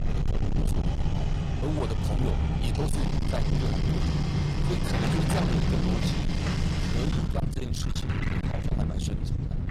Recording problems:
distortion; heavy; 32% of the sound clipped
garbled, watery; slightly
household noises; very loud; throughout; 4 dB above the speech
low rumble; loud; throughout; 3 dB below the speech
voice in the background; faint; throughout; 20 dB below the speech

